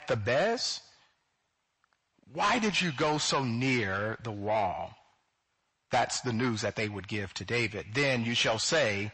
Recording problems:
distortion; heavy; 7 dB below the speech
garbled, watery; slightly; nothing above 8 kHz

